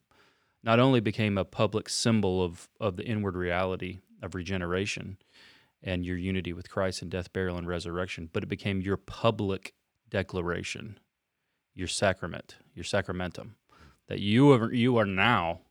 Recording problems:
none

